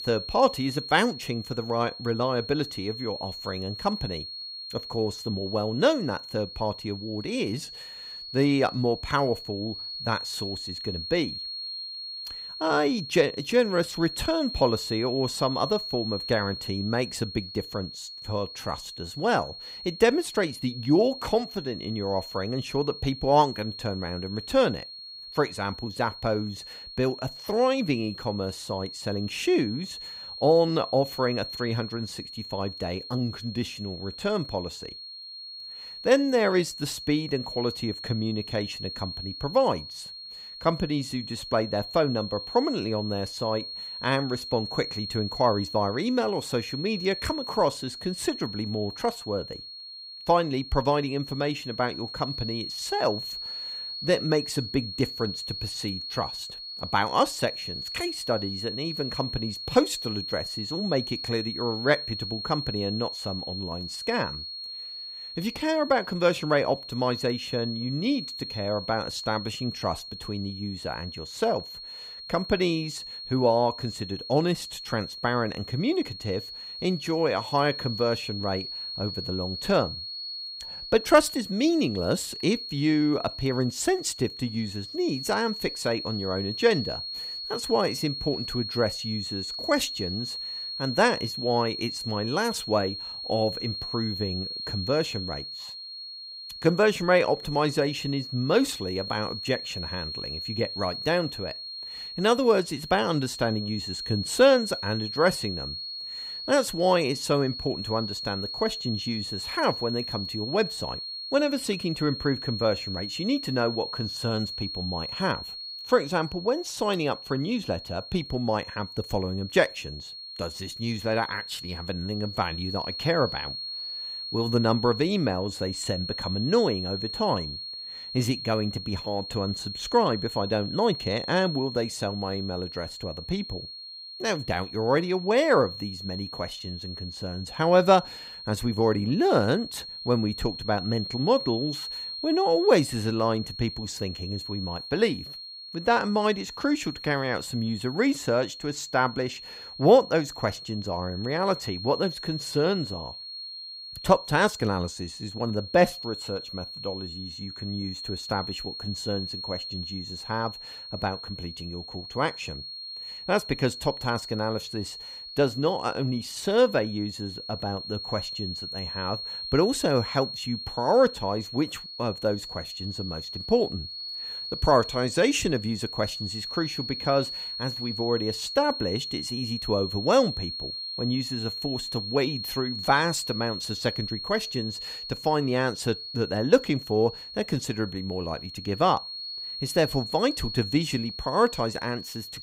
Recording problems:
high-pitched whine; loud; throughout; 4.5 kHz, 8 dB below the speech

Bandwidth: 15.5 kHz